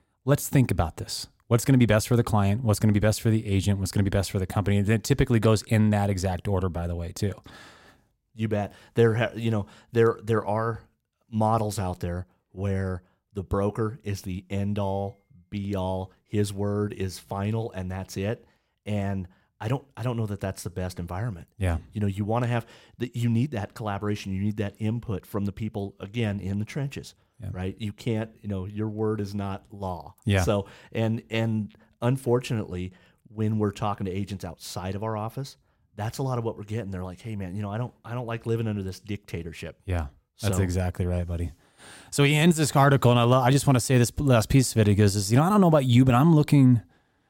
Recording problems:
none

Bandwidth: 16 kHz